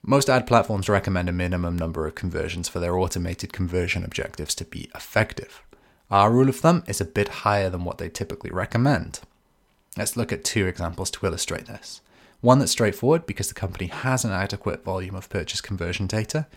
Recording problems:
none

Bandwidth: 16.5 kHz